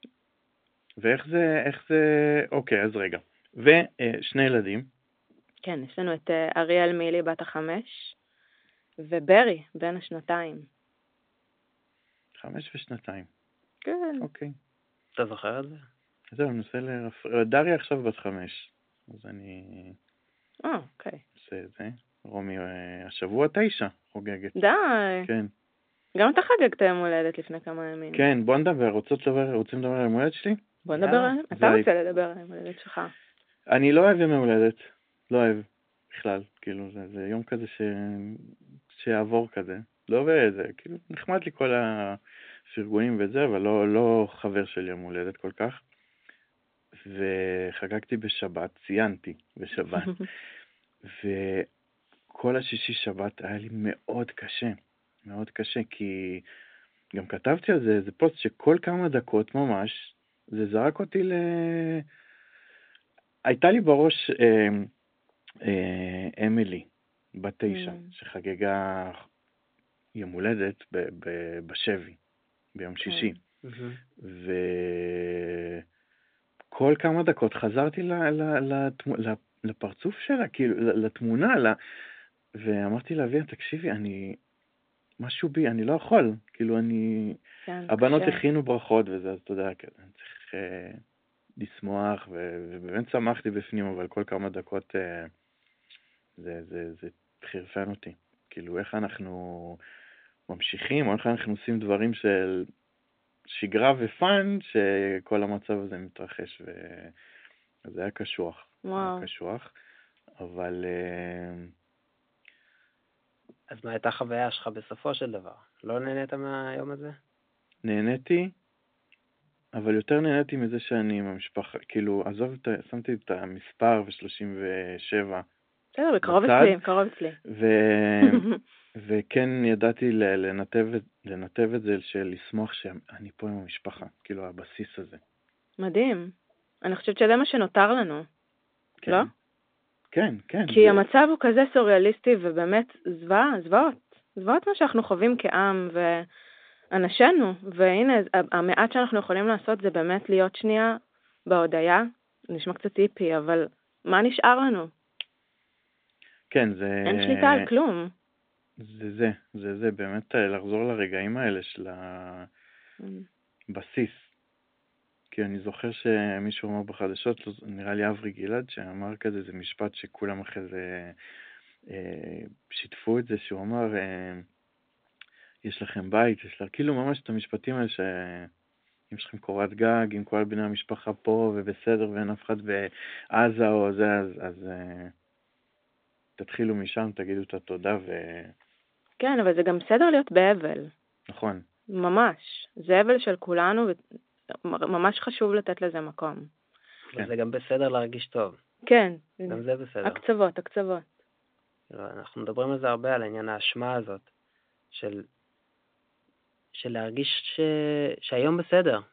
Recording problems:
phone-call audio; nothing above 3.5 kHz

